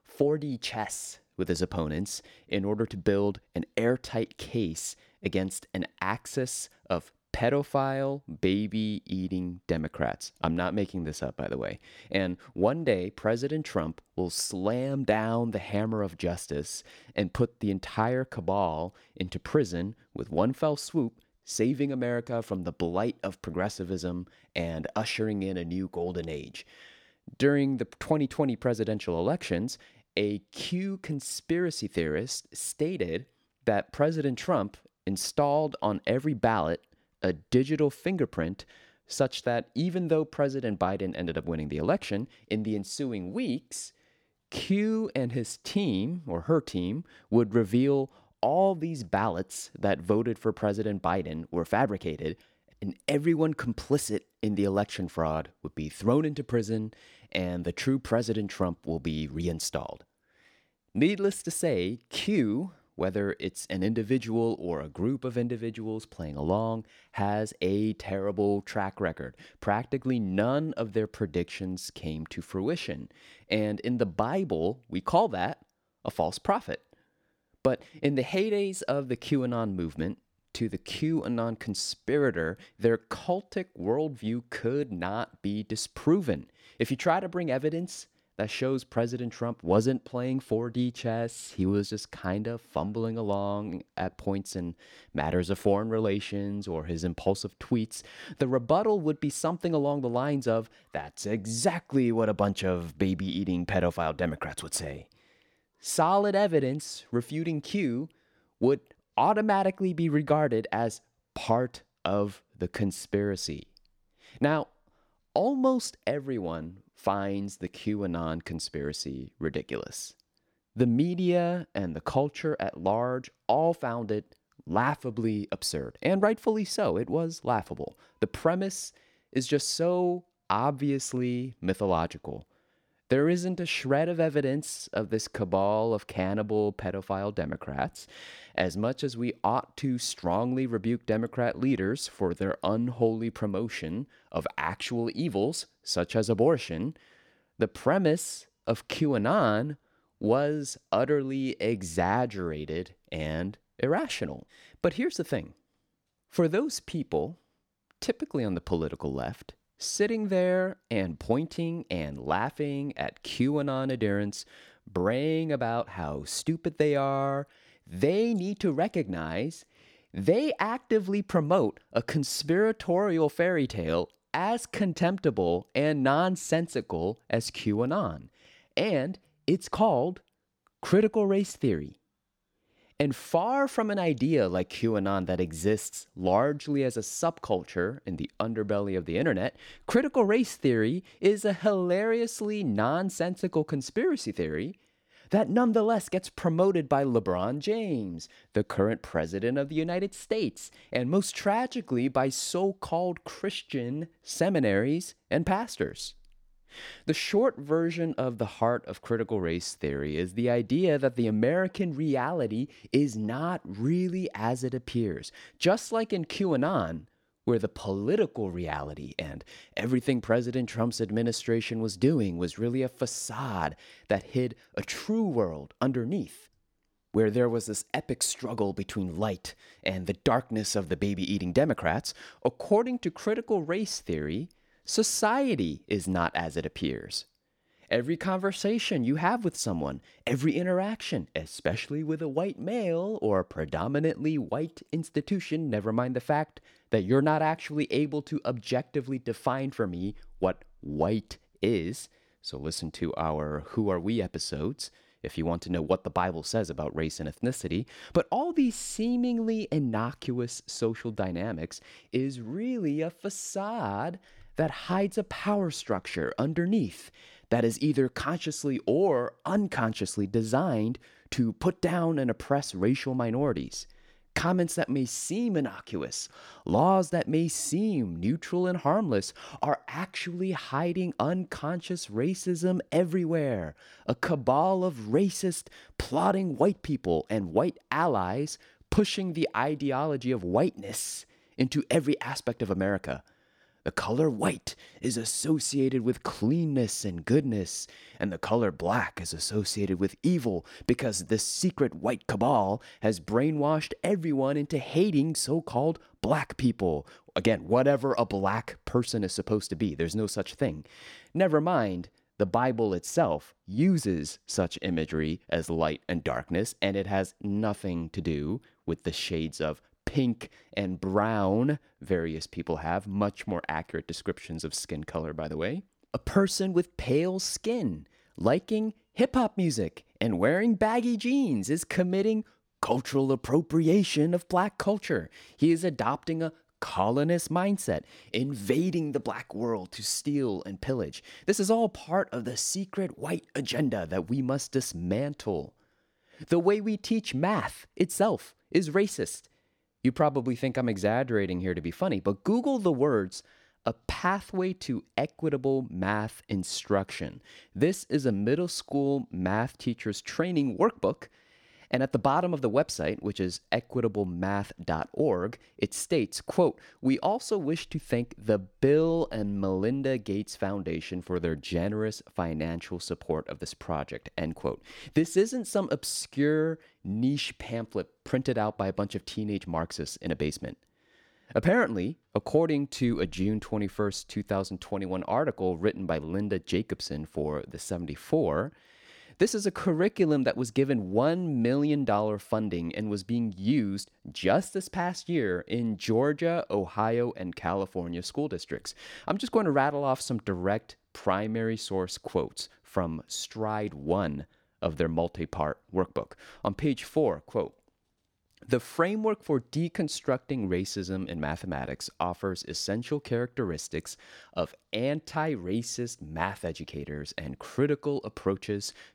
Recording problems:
none

